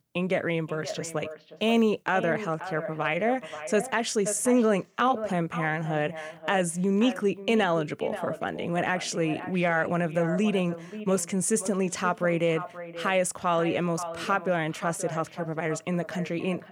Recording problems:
echo of what is said; strong; throughout; 530 ms later, 10 dB below the speech

